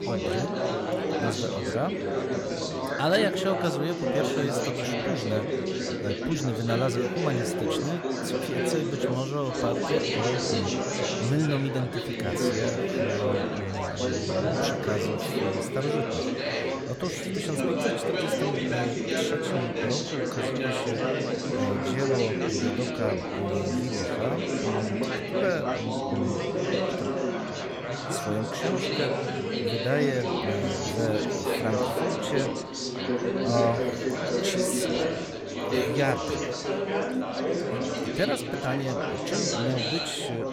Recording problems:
chatter from many people; very loud; throughout; 3 dB above the speech

